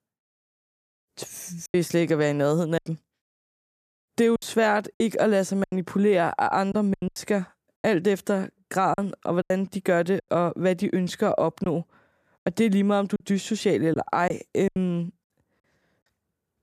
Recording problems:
choppy; very; from 1.5 to 5.5 s, from 6.5 to 10 s and from 12 to 15 s; 10% of the speech affected

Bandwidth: 14.5 kHz